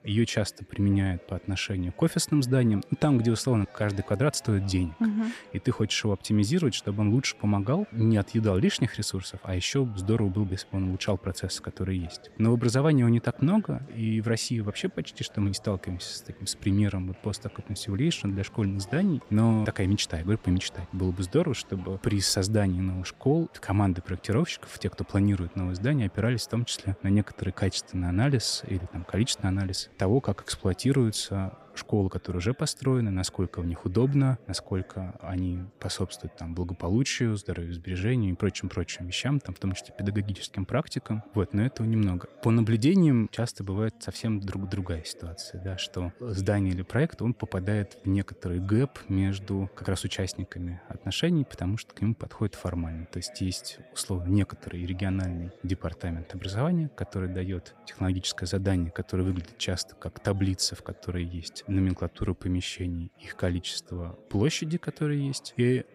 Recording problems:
chatter from many people; faint; throughout; 25 dB below the speech

